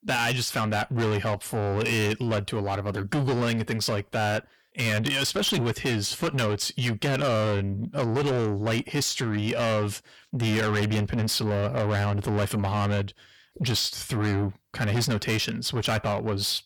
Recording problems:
distortion; heavy; 6 dB below the speech

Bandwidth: 18.5 kHz